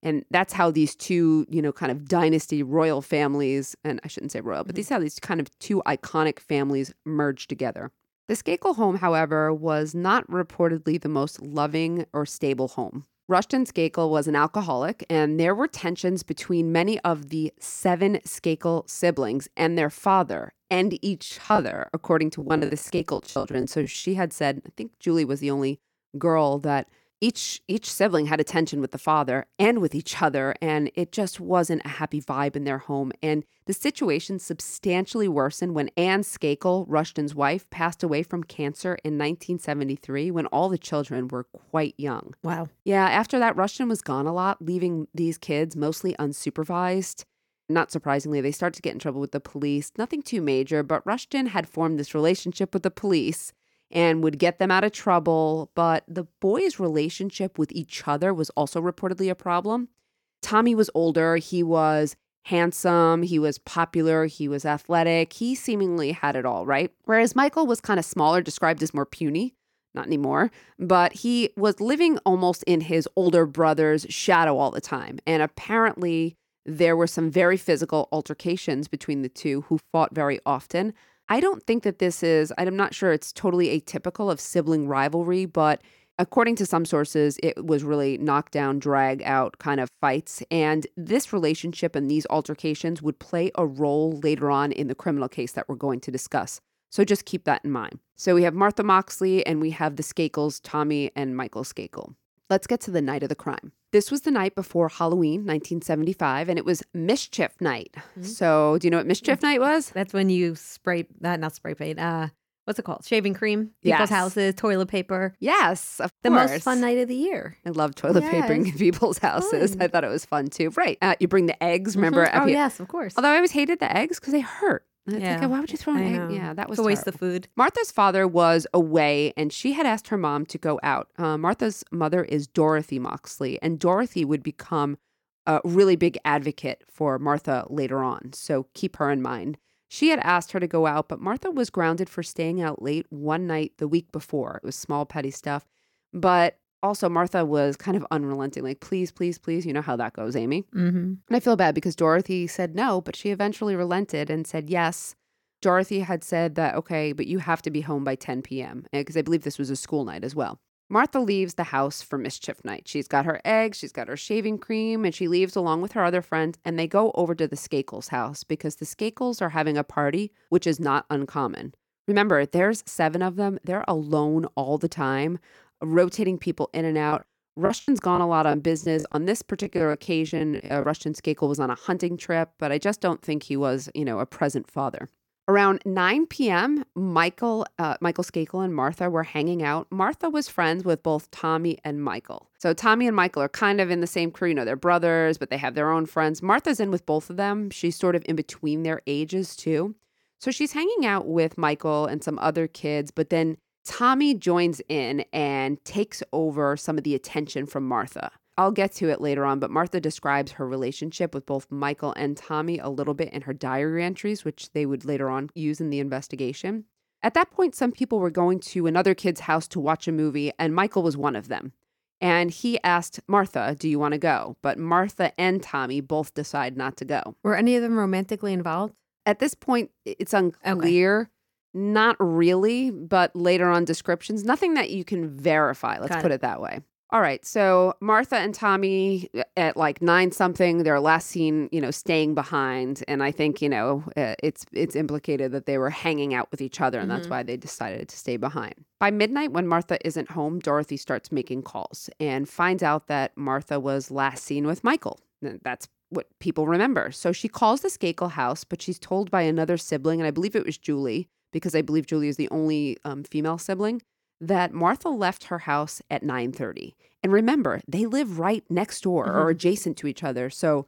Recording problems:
choppy; very; from 21 to 24 s and from 2:57 to 3:01; 16% of the speech affected

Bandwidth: 17 kHz